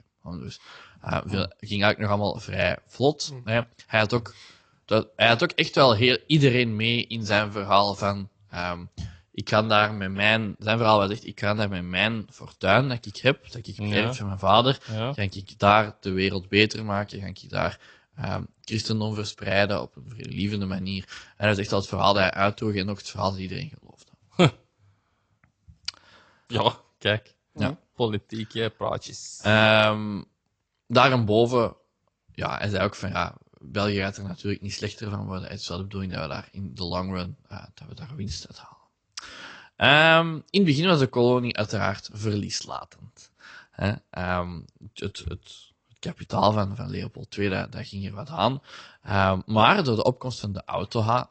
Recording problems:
high frequencies cut off; noticeable; nothing above 8 kHz
garbled, watery; slightly

